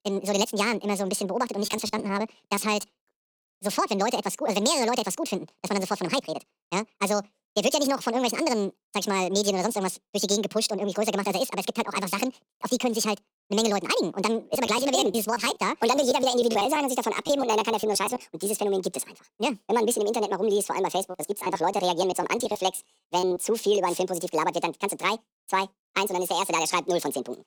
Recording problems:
wrong speed and pitch; too fast and too high; 1.7 times normal speed
choppy; very; from 1.5 to 3 s, from 15 to 18 s and from 21 to 23 s; 15% of the speech affected

